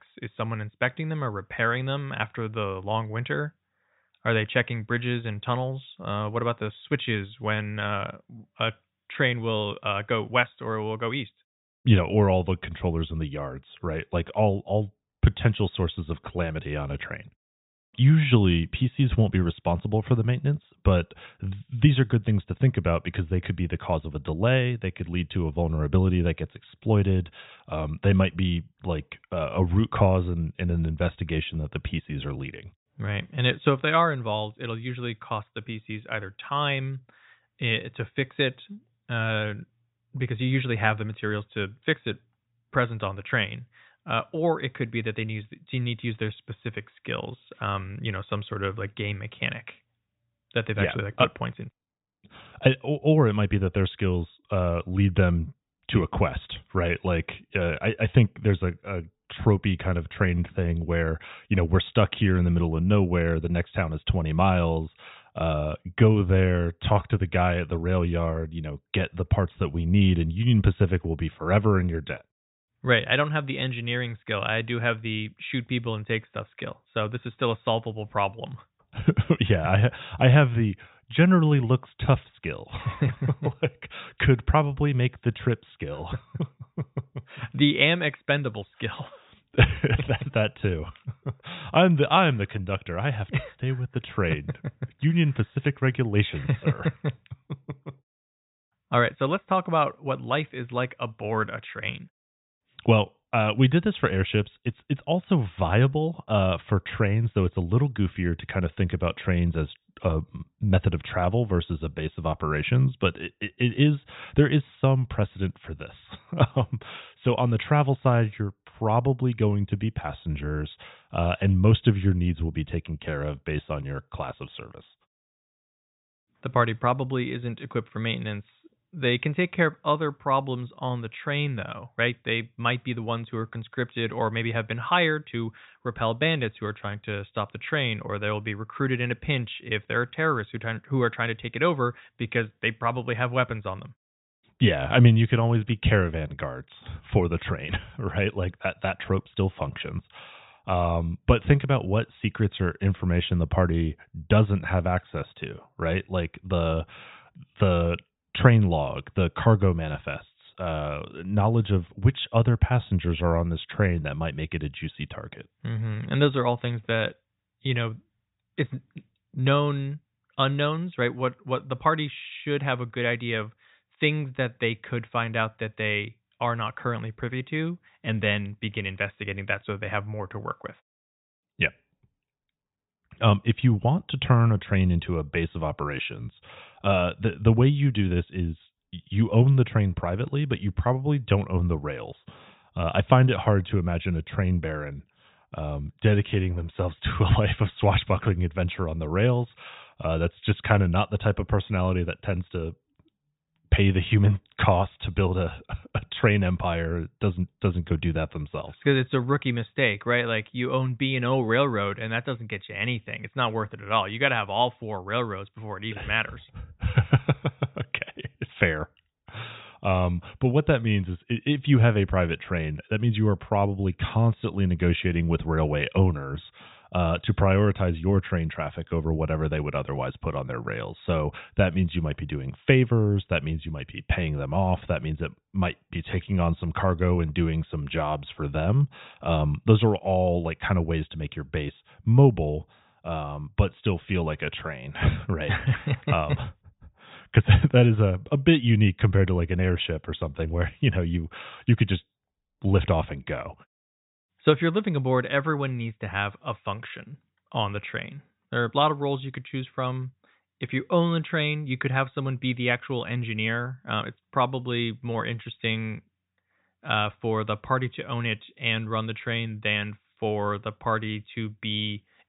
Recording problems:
high frequencies cut off; severe; nothing above 4 kHz

